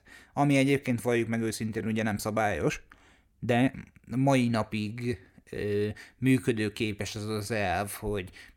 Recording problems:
uneven, jittery; strongly; from 1 to 7.5 s

